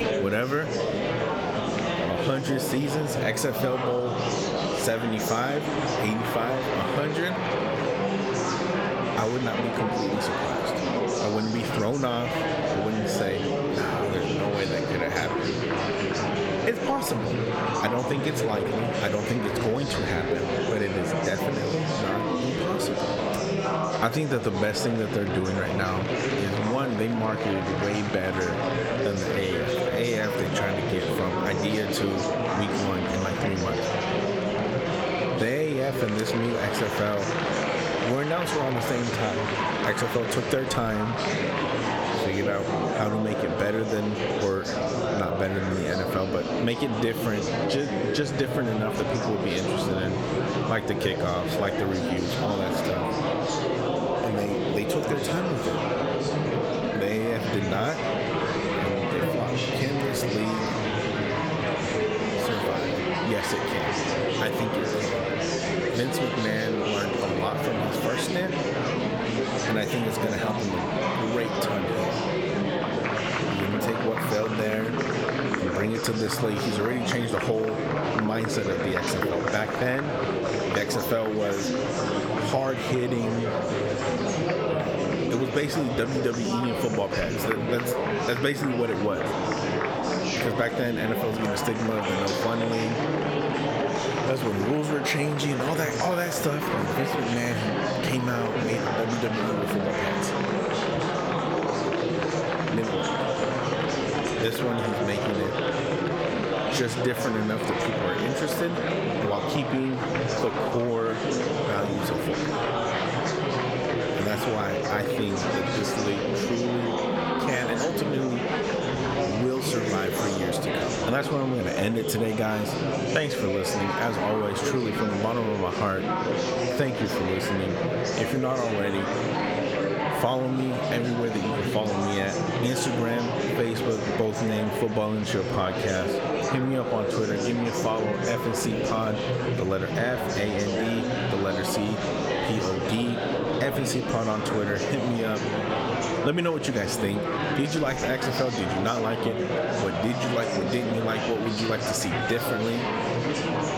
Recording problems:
squashed, flat; somewhat
murmuring crowd; very loud; throughout; 1 dB above the speech

